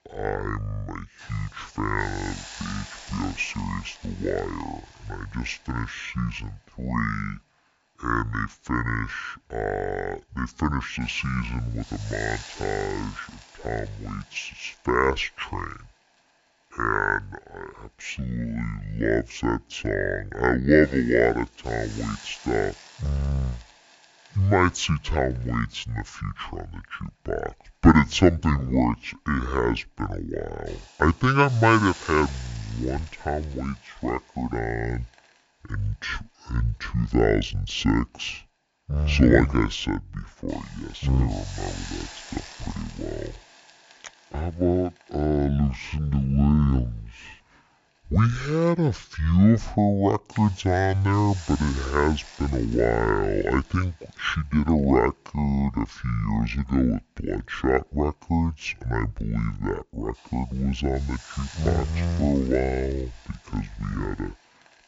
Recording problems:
wrong speed and pitch; too slow and too low; 0.6 times normal speed
high frequencies cut off; noticeable; nothing above 7.5 kHz
hiss; noticeable; throughout; 20 dB below the speech

